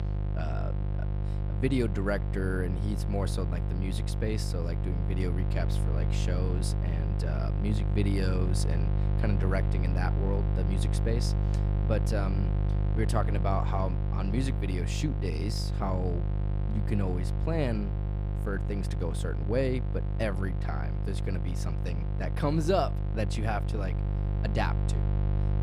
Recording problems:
electrical hum; loud; throughout; 50 Hz, 7 dB below the speech

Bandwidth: 15 kHz